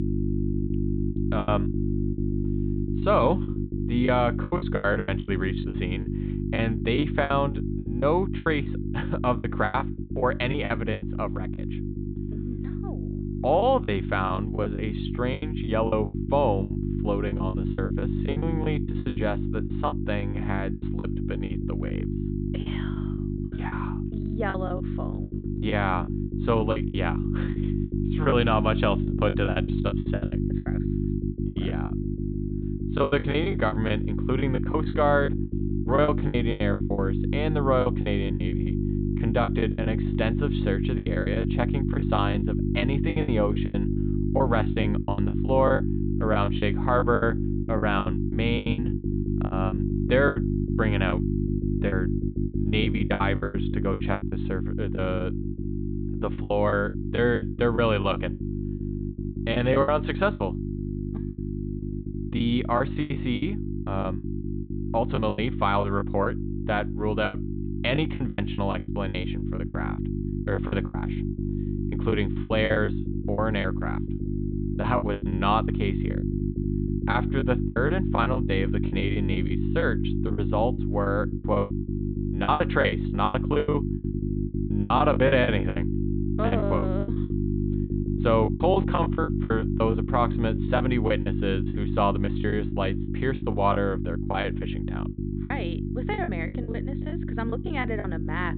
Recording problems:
high frequencies cut off; severe; nothing above 4 kHz
electrical hum; loud; throughout; 50 Hz, 8 dB below the speech
choppy; very; 17% of the speech affected

